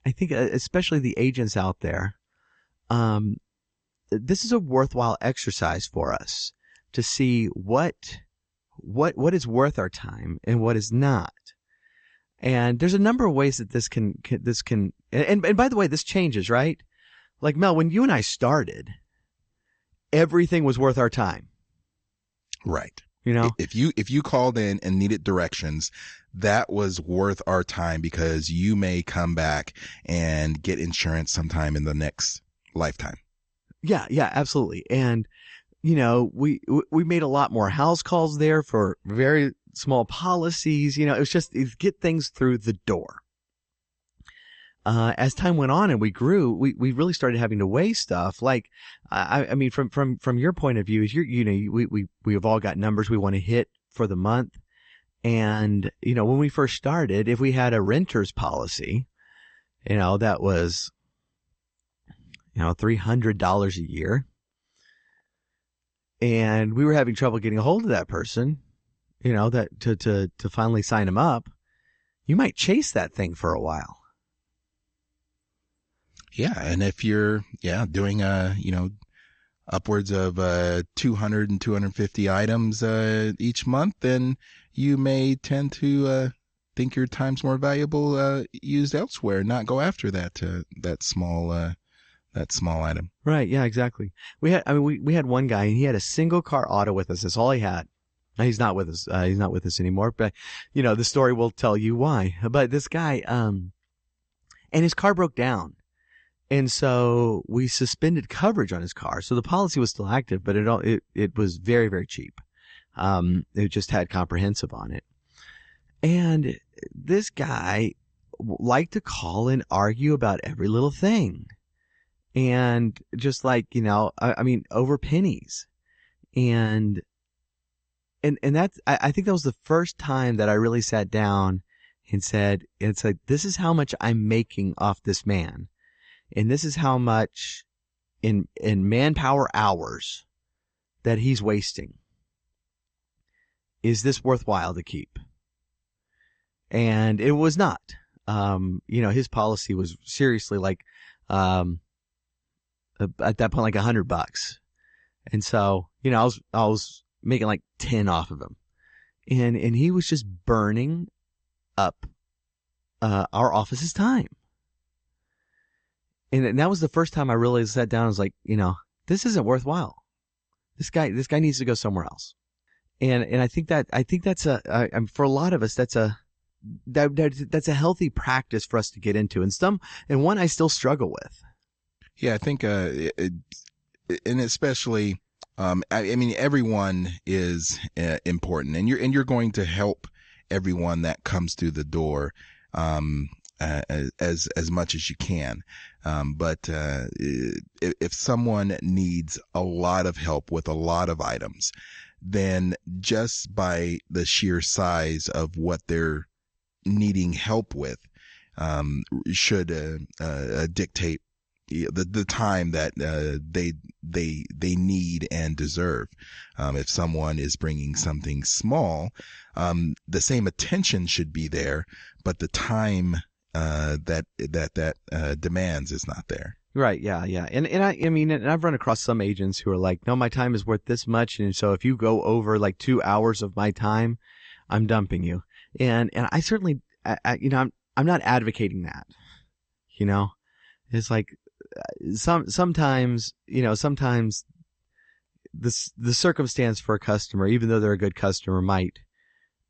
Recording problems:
garbled, watery; slightly; nothing above 7.5 kHz
high frequencies cut off; slight

